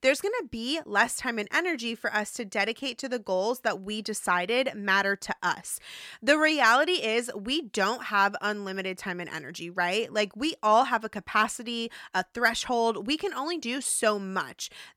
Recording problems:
none

